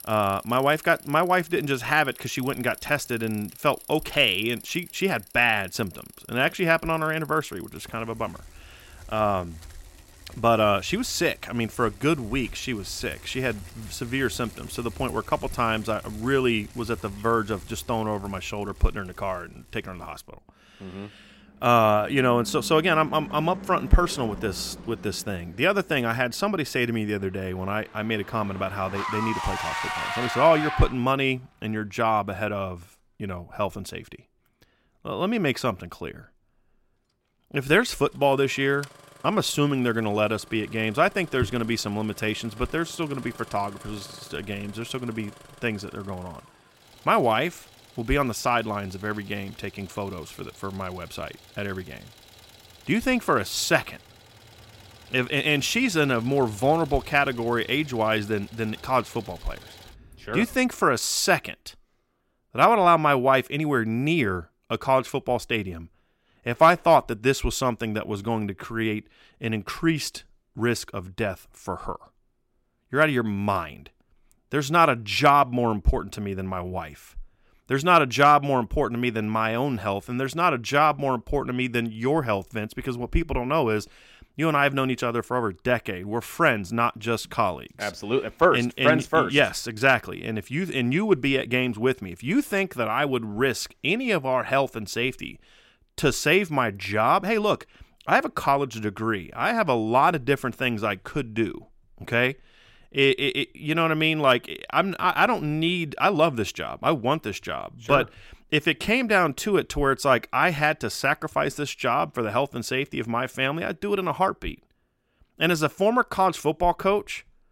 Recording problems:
traffic noise; noticeable; until 1:01; 15 dB below the speech

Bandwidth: 16 kHz